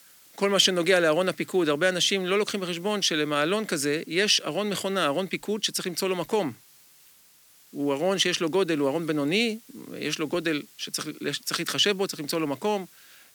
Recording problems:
hiss; faint; throughout; 25 dB below the speech

